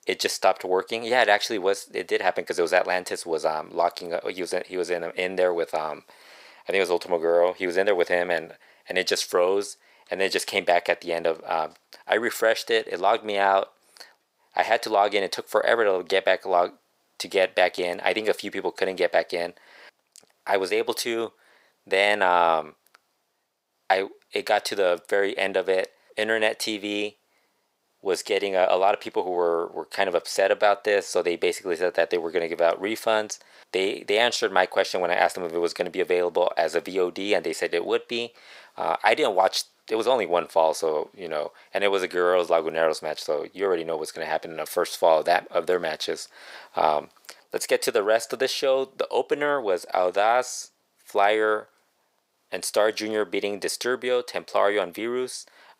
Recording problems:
thin; very; fading below 600 Hz

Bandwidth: 15.5 kHz